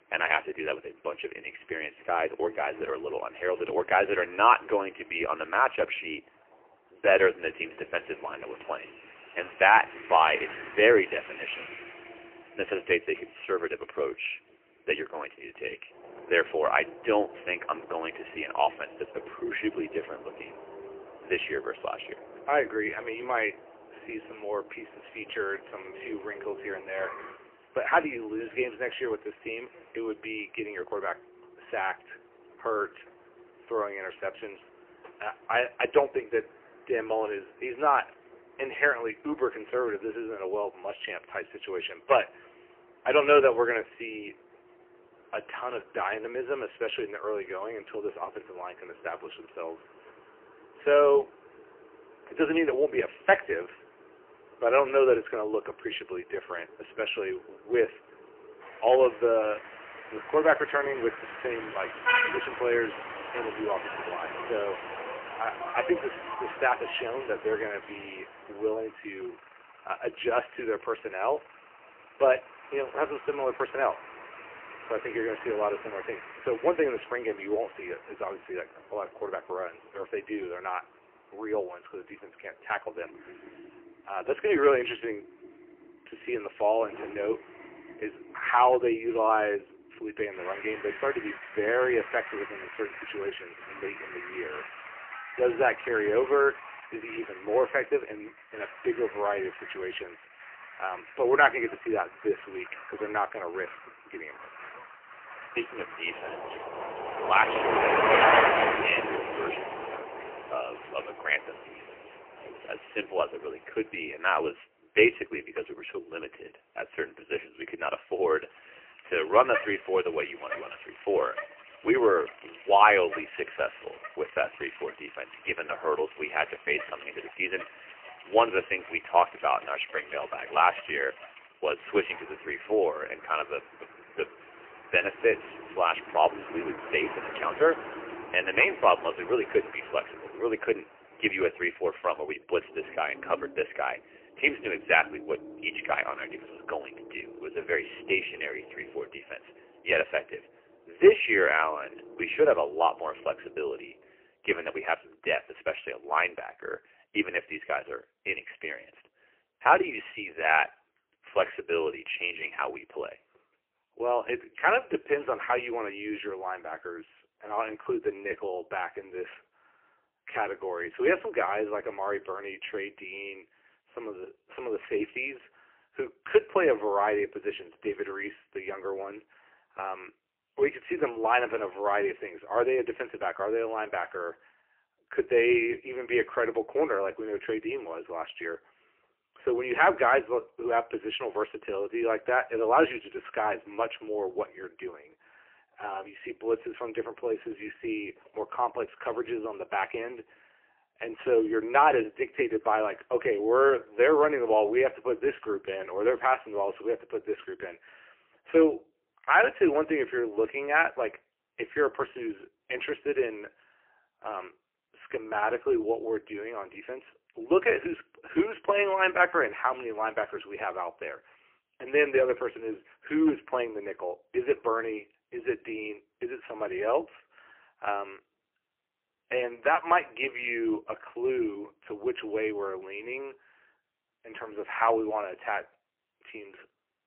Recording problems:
phone-call audio; poor line; nothing above 3 kHz
traffic noise; loud; until 2:34; 8 dB below the speech

